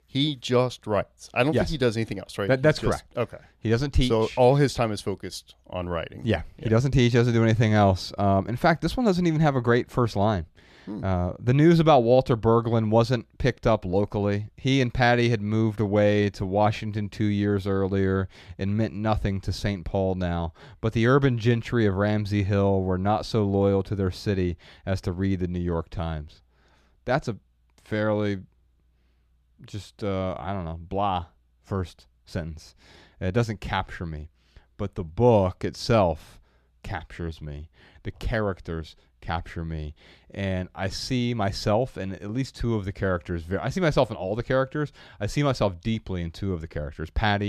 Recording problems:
abrupt cut into speech; at the end

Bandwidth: 14.5 kHz